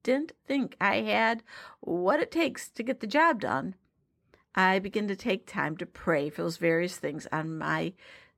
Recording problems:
none

